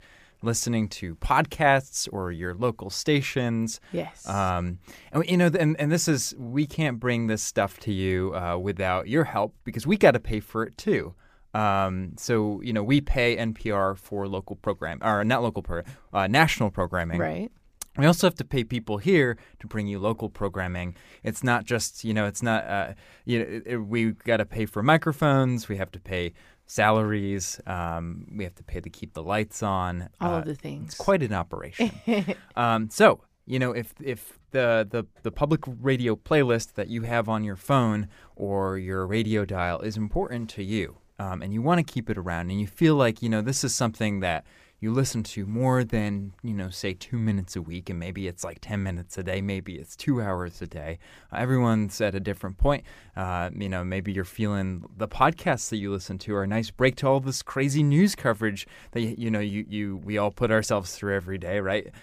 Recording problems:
none

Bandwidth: 15 kHz